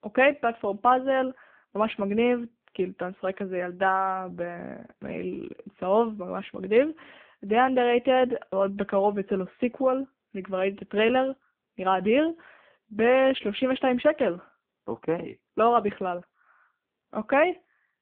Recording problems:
phone-call audio; poor line

